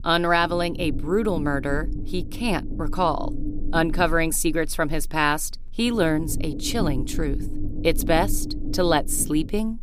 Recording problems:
low rumble; noticeable; throughout; 15 dB below the speech

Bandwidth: 15 kHz